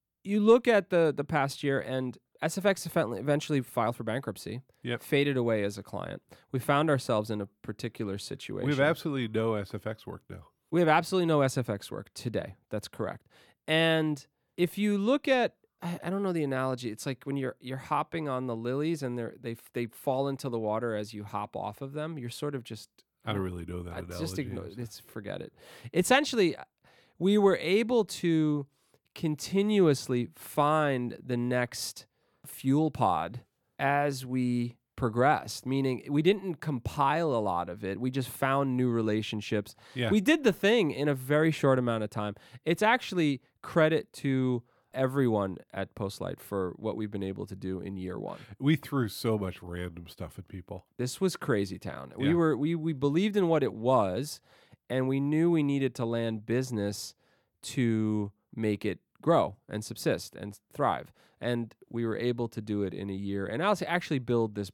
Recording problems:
none

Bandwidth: 18.5 kHz